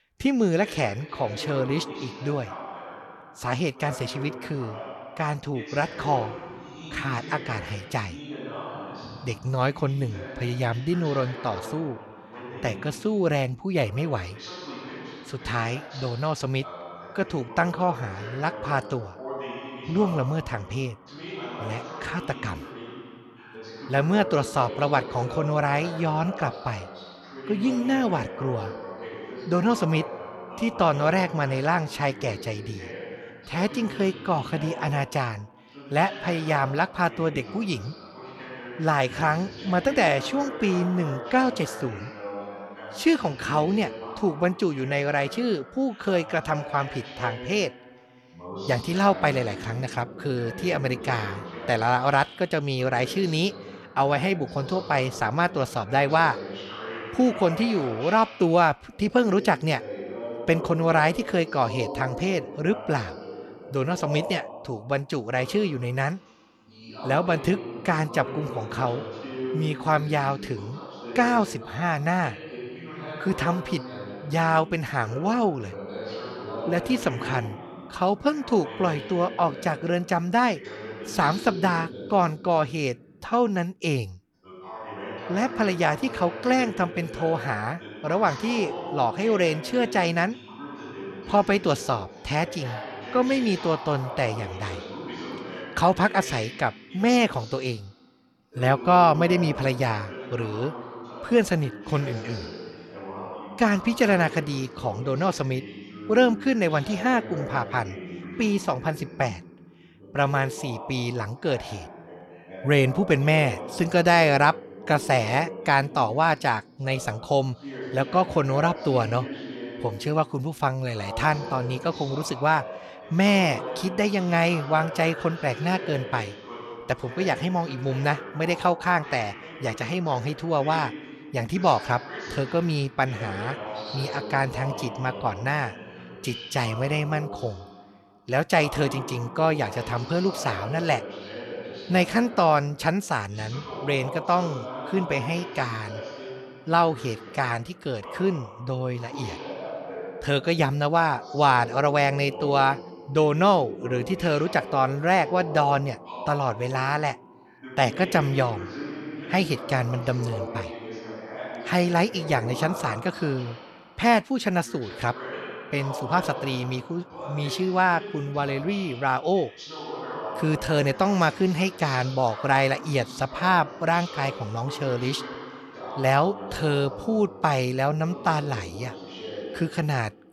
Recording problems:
voice in the background; noticeable; throughout; 10 dB below the speech

